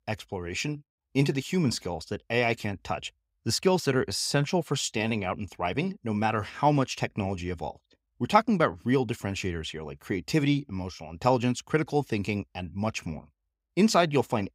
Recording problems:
none

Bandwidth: 15.5 kHz